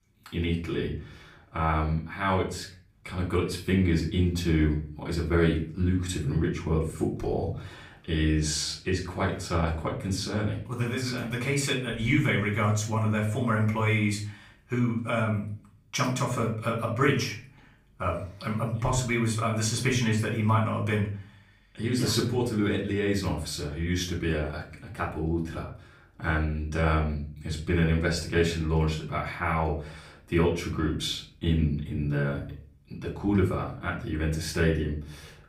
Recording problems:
off-mic speech; far
room echo; slight; dies away in 0.4 s

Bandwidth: 15.5 kHz